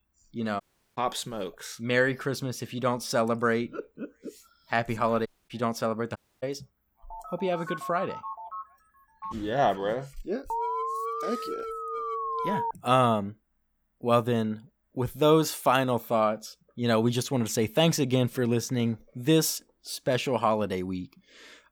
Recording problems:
audio cutting out; at 0.5 s, at 5.5 s and at 6 s
phone ringing; noticeable; from 7 to 9.5 s; peak 9 dB below the speech
alarm; noticeable; from 11 to 13 s; peak 2 dB below the speech

